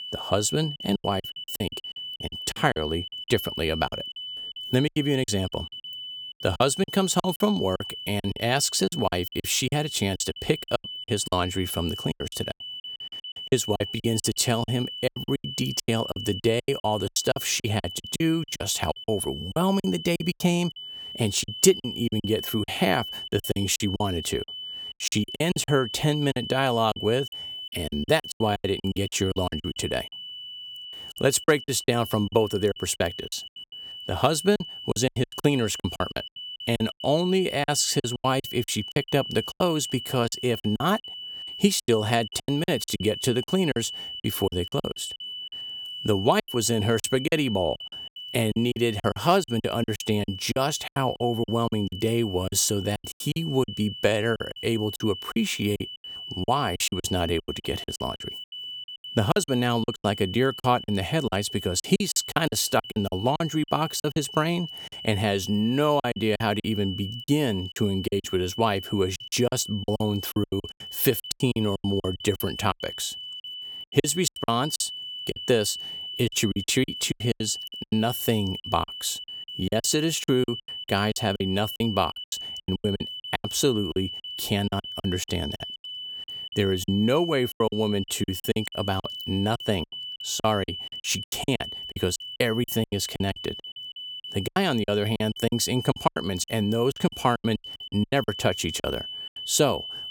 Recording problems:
high-pitched whine; loud; throughout; 3 kHz, 9 dB below the speech
choppy; very; 17% of the speech affected

